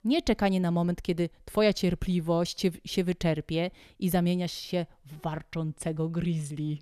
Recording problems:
none

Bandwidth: 13.5 kHz